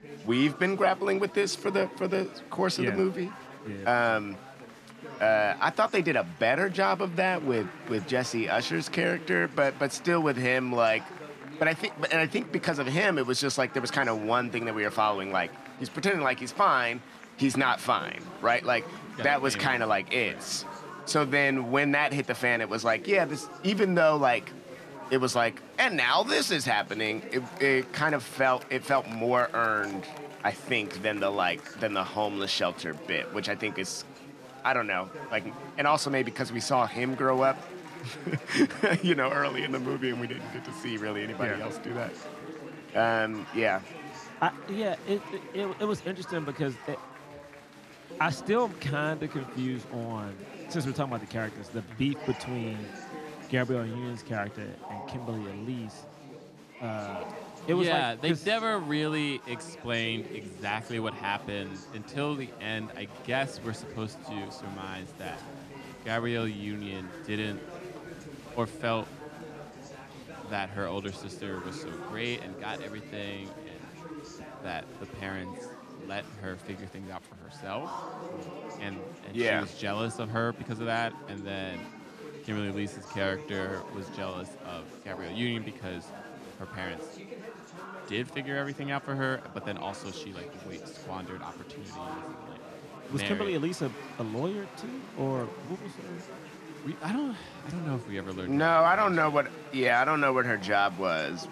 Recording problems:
chatter from many people; noticeable; throughout; 15 dB below the speech

